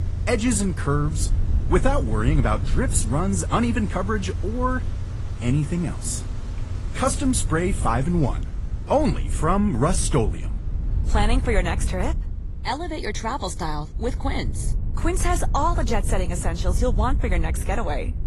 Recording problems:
garbled, watery; slightly; nothing above 11 kHz
traffic noise; loud; throughout; 9 dB below the speech
wind noise on the microphone; occasional gusts; 20 dB below the speech

